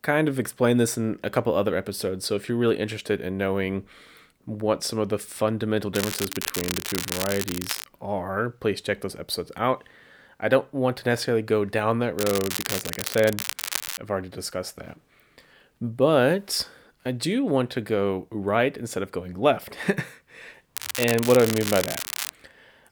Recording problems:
crackling; loud; from 6 to 8 s, from 12 to 14 s and from 21 to 22 s; 4 dB below the speech

